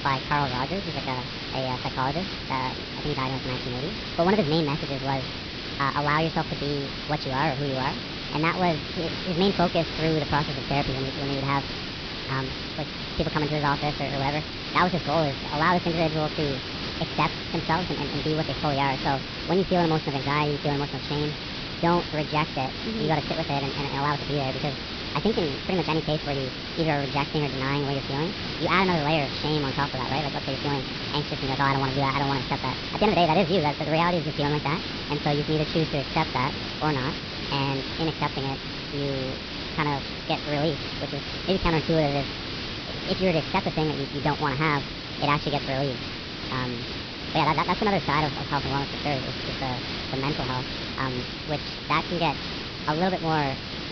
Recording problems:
wrong speed and pitch; too fast and too high; 1.5 times normal speed
high frequencies cut off; noticeable; nothing above 5.5 kHz
hiss; loud; throughout; 4 dB below the speech

